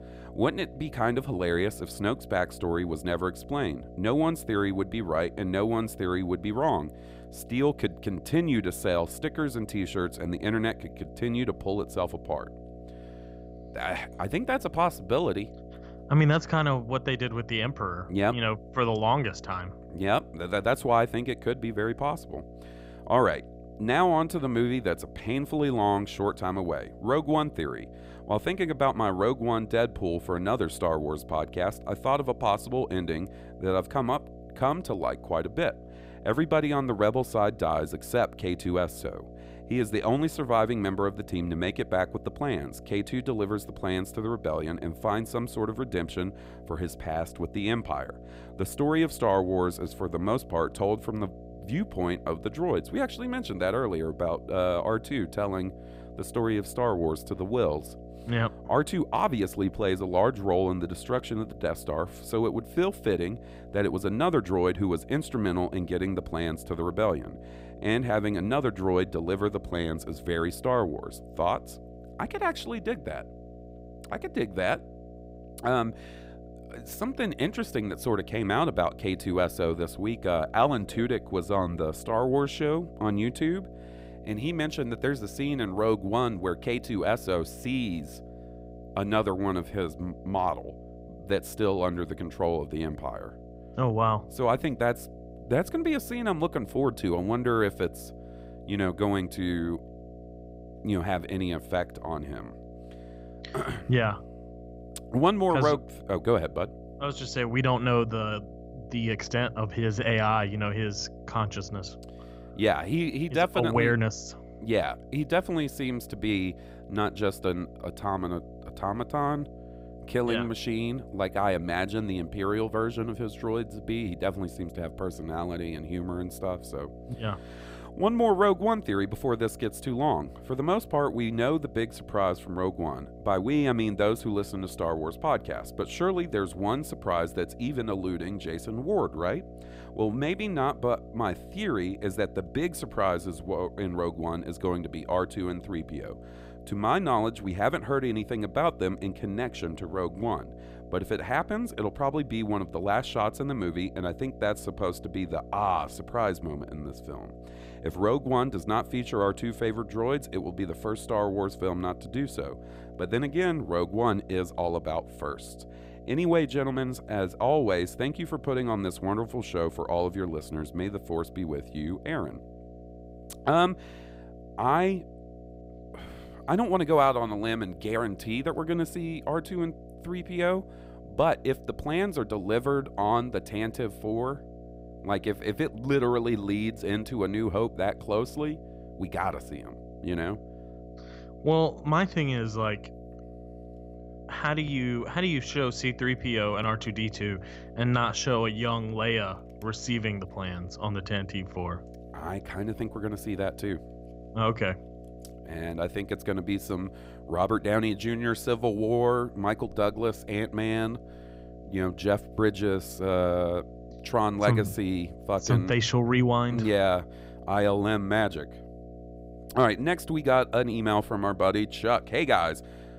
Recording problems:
electrical hum; noticeable; throughout; 60 Hz, 20 dB below the speech

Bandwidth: 15.5 kHz